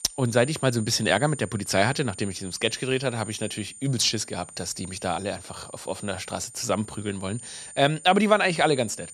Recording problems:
high-pitched whine; noticeable; throughout; 9 kHz, 15 dB below the speech

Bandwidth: 13.5 kHz